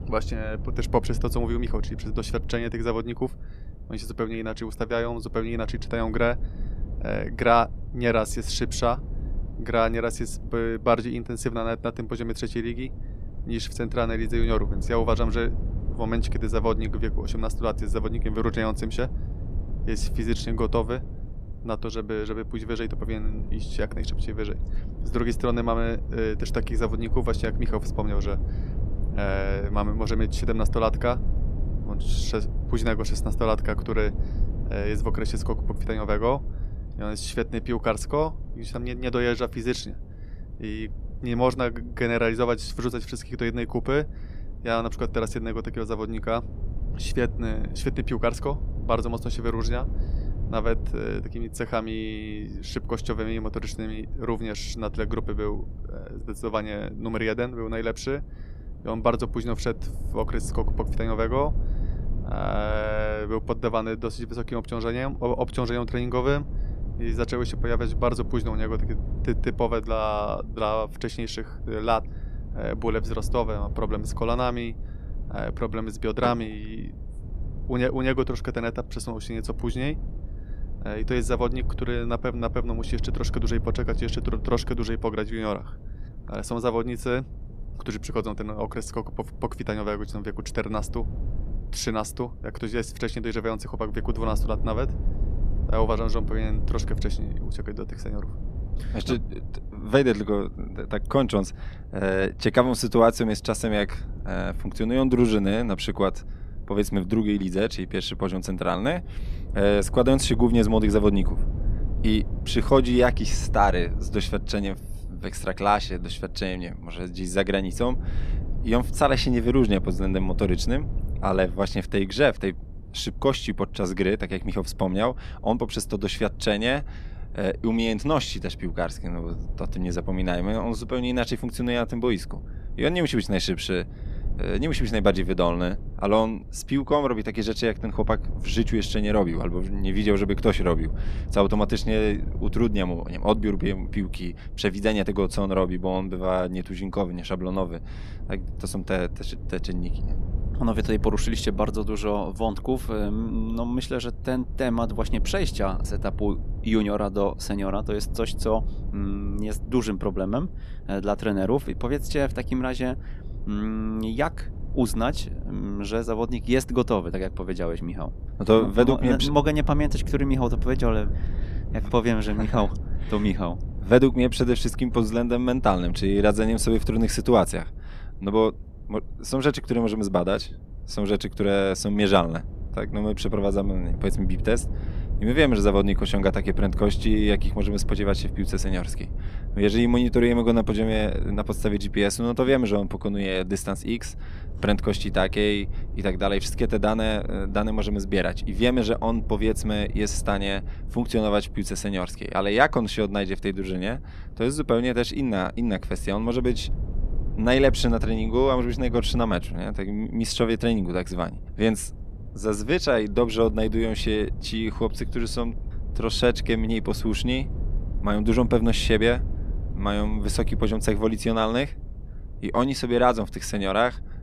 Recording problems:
low rumble; faint; throughout; 20 dB below the speech

